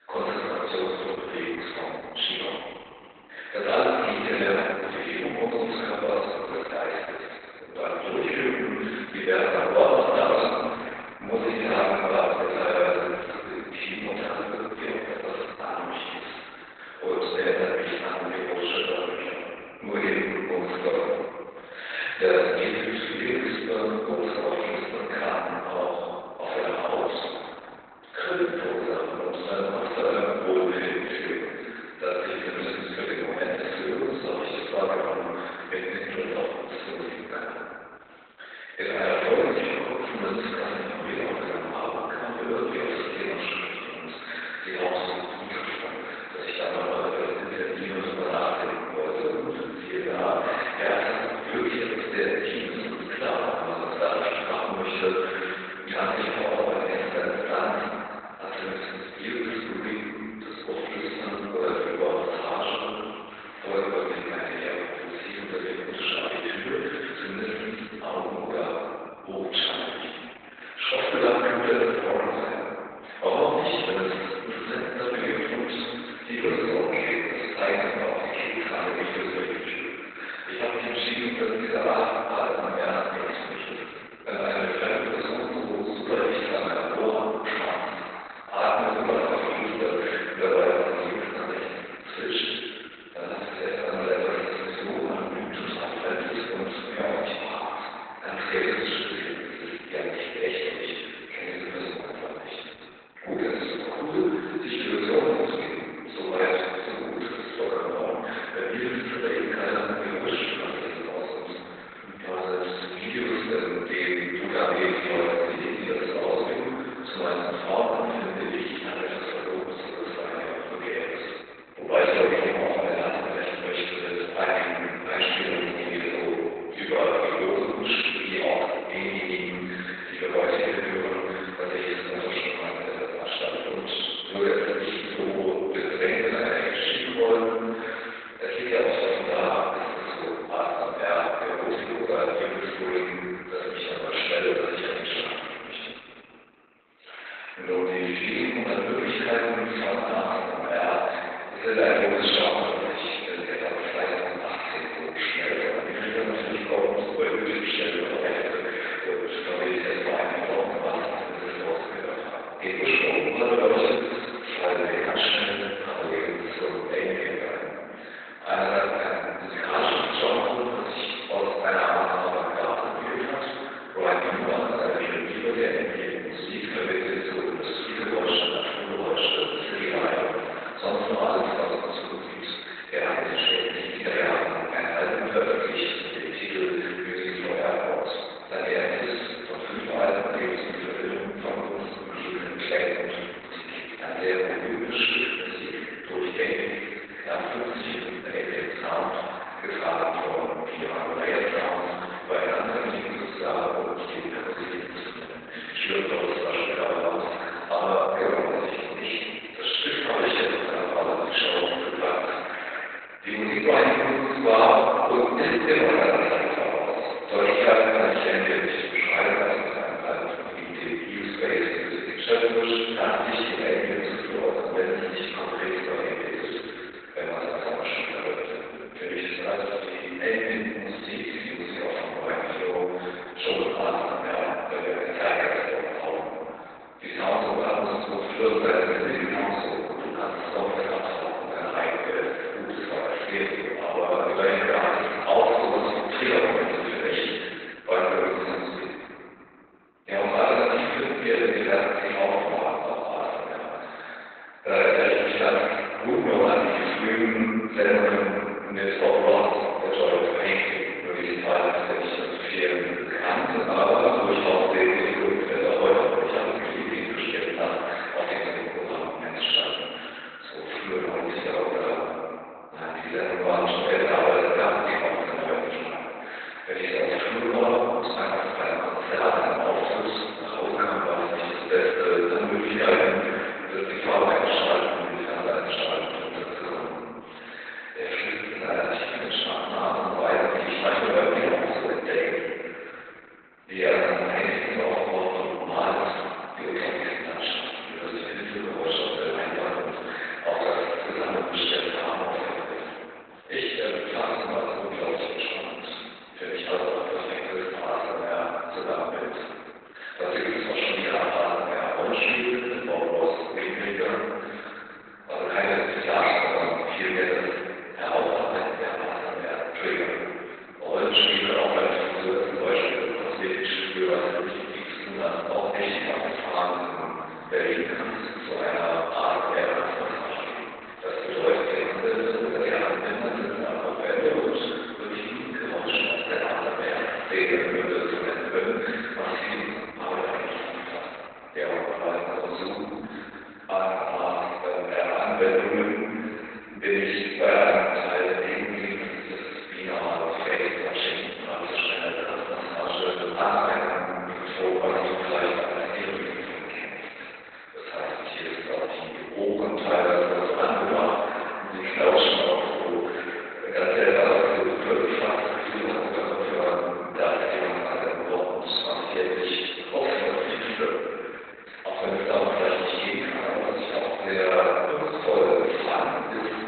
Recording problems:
room echo; strong; dies away in 2.4 s
off-mic speech; far
garbled, watery; badly; nothing above 4 kHz
thin; very; fading below 450 Hz

